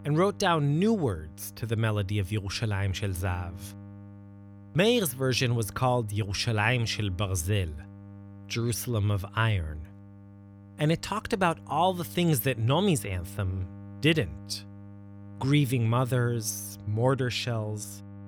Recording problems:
electrical hum; faint; throughout; 50 Hz, 25 dB below the speech

